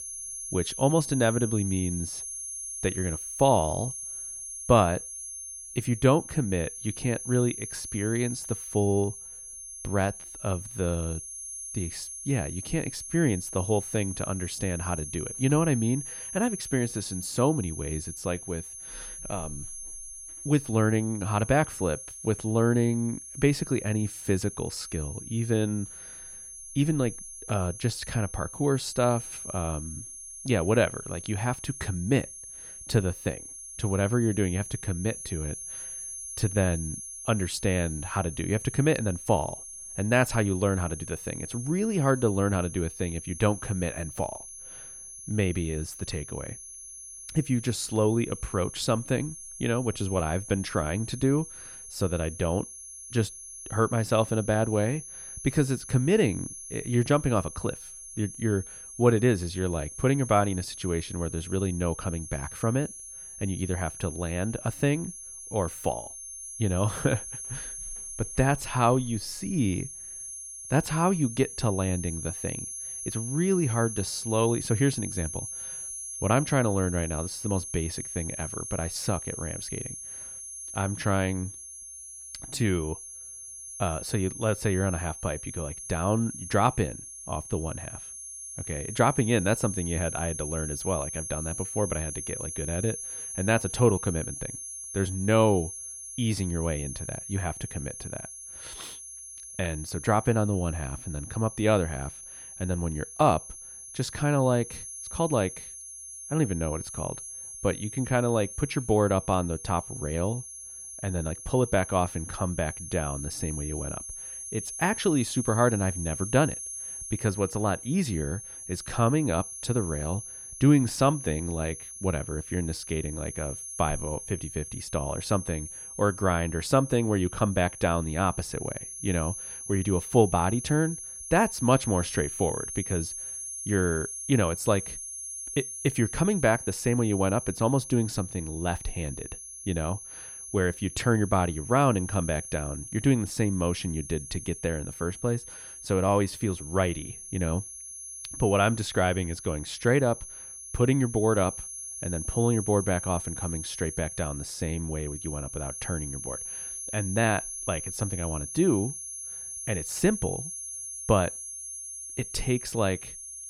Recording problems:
high-pitched whine; loud; throughout; 10.5 kHz, 9 dB below the speech

